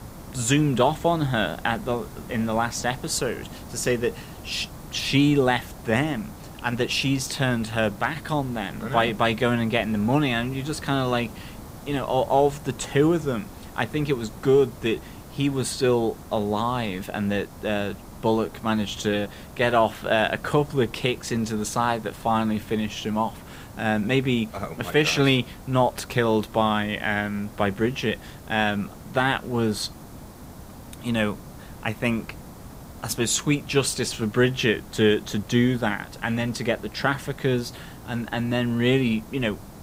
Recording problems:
hiss; noticeable; throughout; 15 dB below the speech

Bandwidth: 15.5 kHz